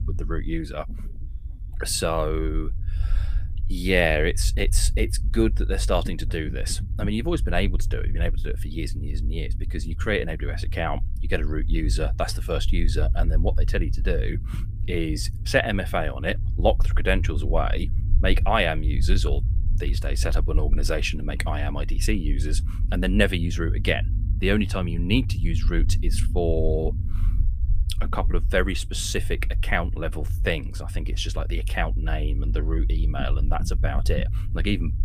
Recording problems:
low rumble; noticeable; throughout; 20 dB below the speech

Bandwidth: 15 kHz